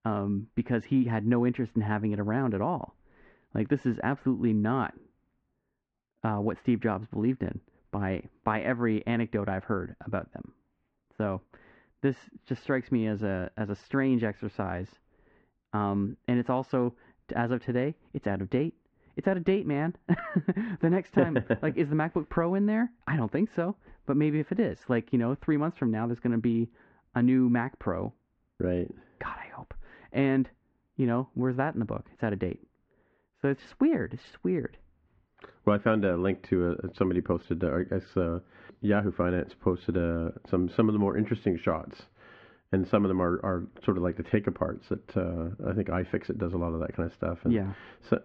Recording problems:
muffled; very; fading above 2 kHz

